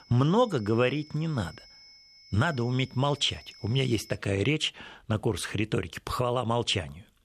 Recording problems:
high-pitched whine; faint; until 4 s; 5 kHz, 20 dB below the speech

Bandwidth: 14 kHz